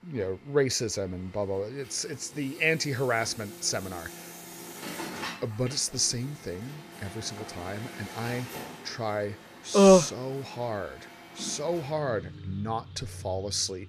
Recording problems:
traffic noise; noticeable; throughout; 15 dB below the speech

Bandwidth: 14.5 kHz